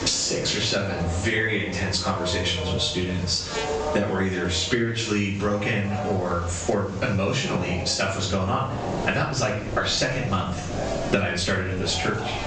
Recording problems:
off-mic speech; far
room echo; noticeable; dies away in 0.5 s
high frequencies cut off; noticeable; nothing above 8 kHz
squashed, flat; somewhat, background pumping
train or aircraft noise; loud; throughout; 10 dB below the speech
electrical hum; noticeable; throughout; 50 Hz, 15 dB below the speech

